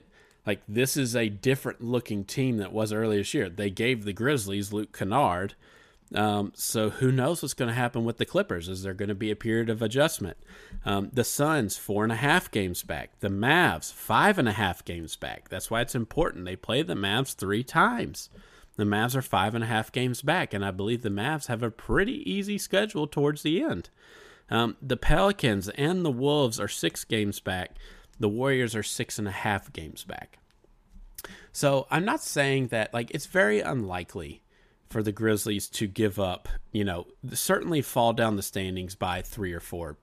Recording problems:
none

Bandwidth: 14.5 kHz